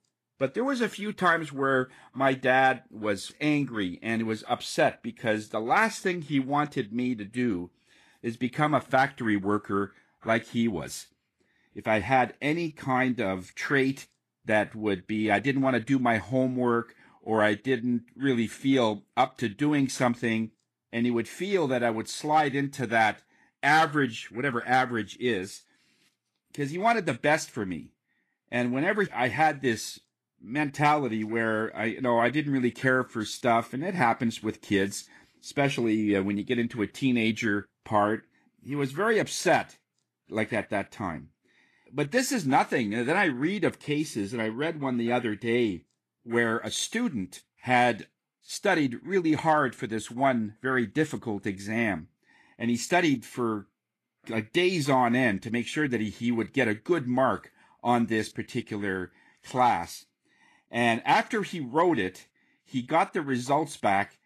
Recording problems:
garbled, watery; slightly; nothing above 12.5 kHz

